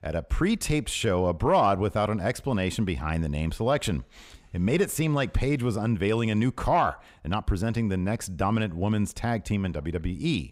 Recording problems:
none

